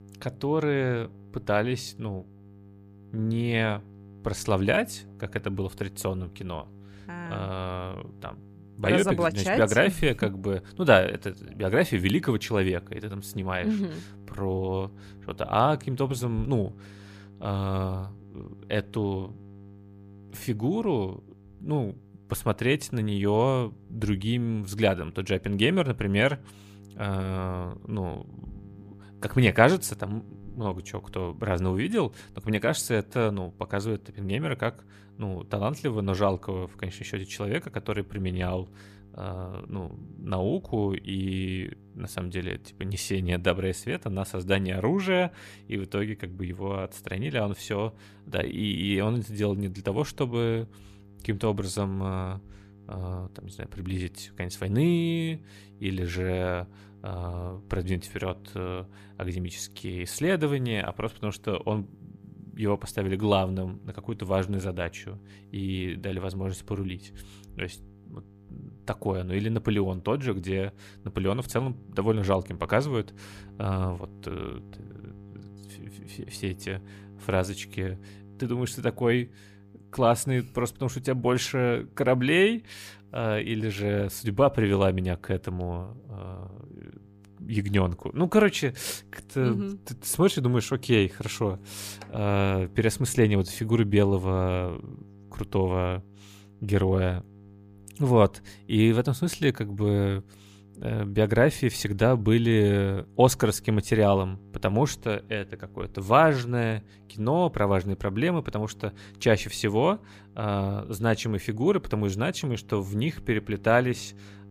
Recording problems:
electrical hum; faint; throughout; 50 Hz, 30 dB below the speech

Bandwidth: 15 kHz